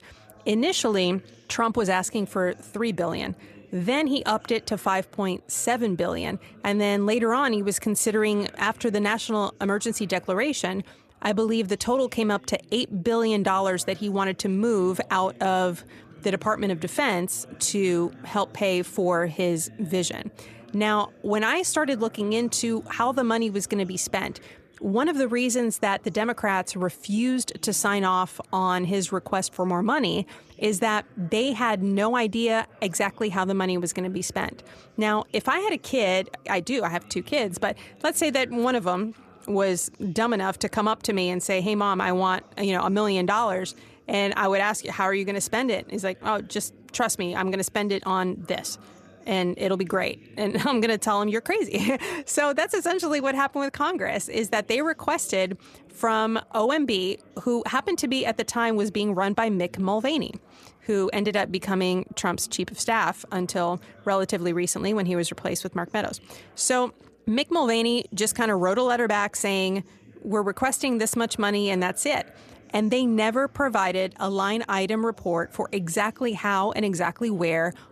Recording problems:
chatter from many people; faint; throughout; 25 dB below the speech

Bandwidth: 14 kHz